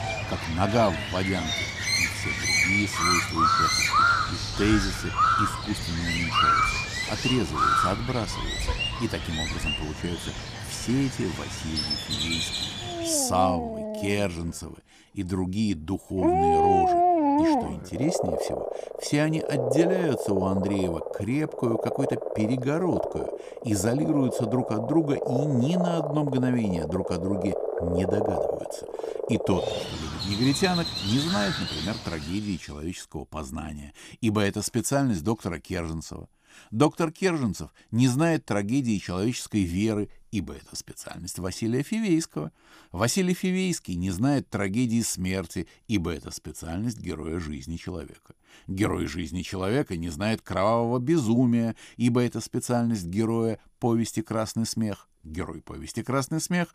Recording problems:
animal sounds; very loud; until 32 s; 1 dB above the speech

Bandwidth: 15 kHz